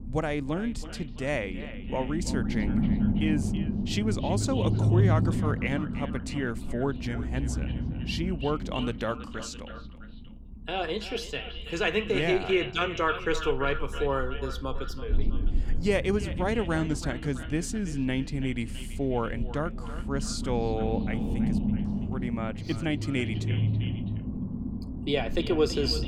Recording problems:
echo of what is said; noticeable; throughout; 330 ms later, 10 dB below the speech
low rumble; loud; throughout; 9 dB below the speech

